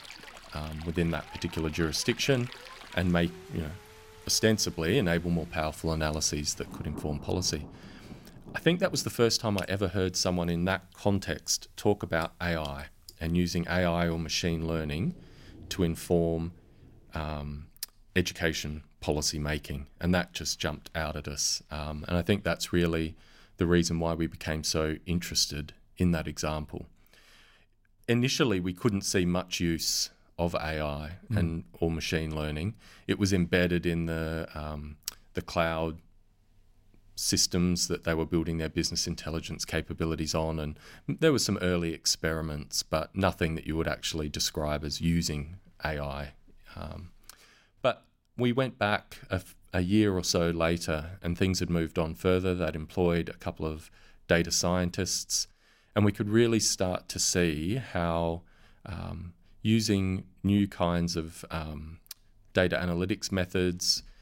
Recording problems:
rain or running water; noticeable; until 18 s; 20 dB below the speech

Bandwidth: 16 kHz